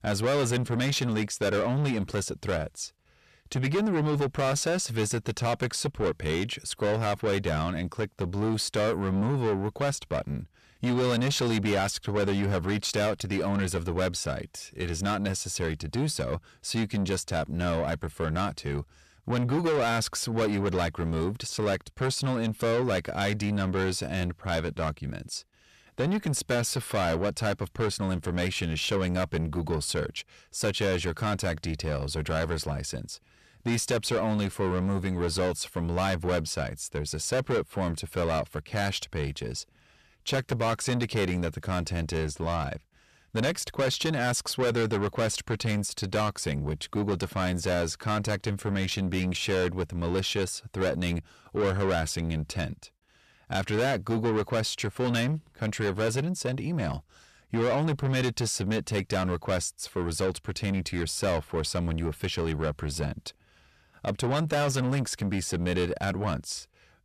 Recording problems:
distortion; heavy; 8 dB below the speech

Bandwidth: 14 kHz